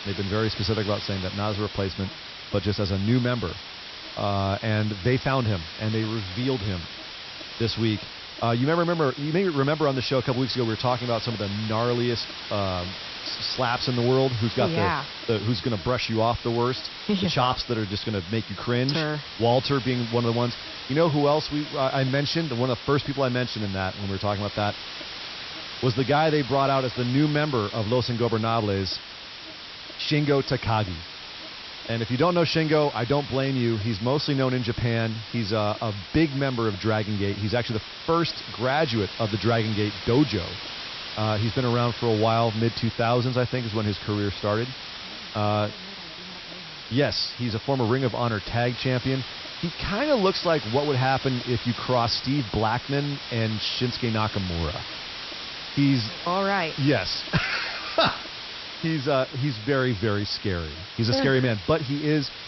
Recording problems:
high frequencies cut off; noticeable; nothing above 5.5 kHz
hiss; loud; throughout; 10 dB below the speech
electrical hum; faint; throughout; 50 Hz, 30 dB below the speech

